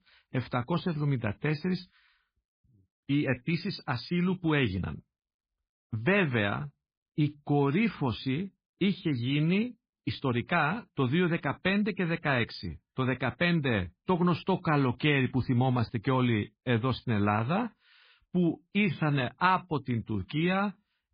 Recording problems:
garbled, watery; badly

